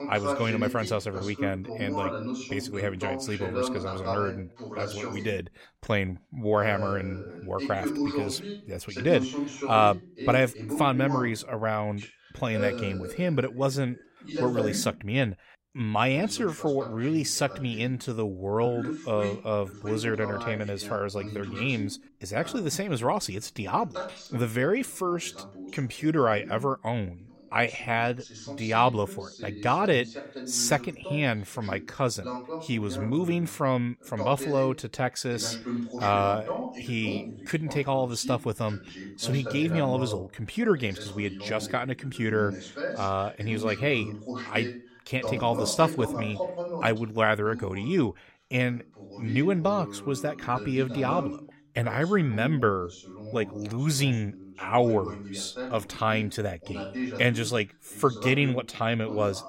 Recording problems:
voice in the background; loud; throughout; 8 dB below the speech

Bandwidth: 16 kHz